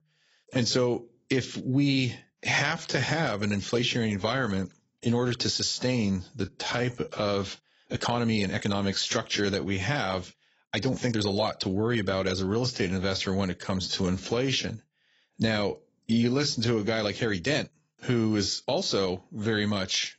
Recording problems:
garbled, watery; badly; nothing above 7.5 kHz
uneven, jittery; strongly; from 2 to 19 s

